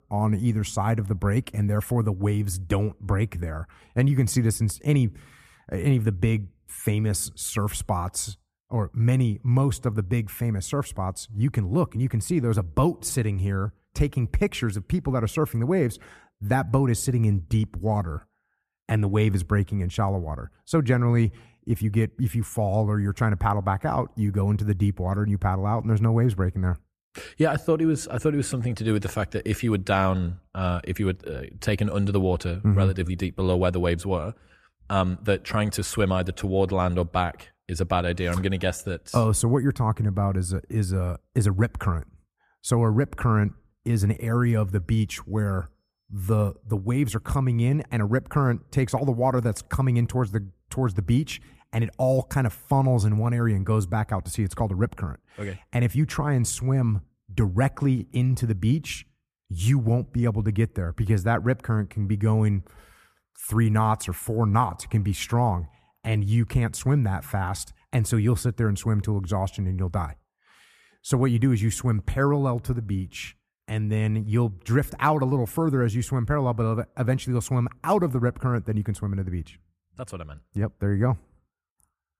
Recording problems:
none

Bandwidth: 14.5 kHz